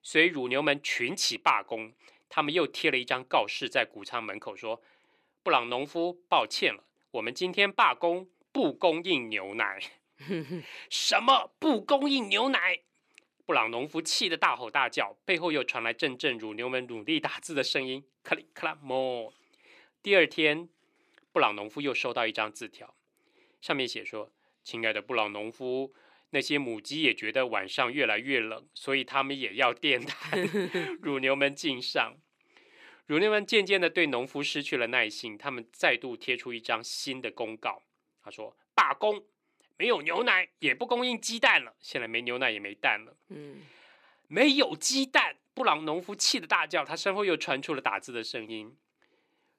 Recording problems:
thin; very slightly; fading below 350 Hz

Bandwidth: 15 kHz